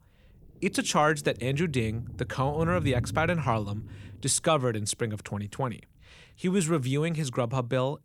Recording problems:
low rumble; faint; throughout; 20 dB below the speech

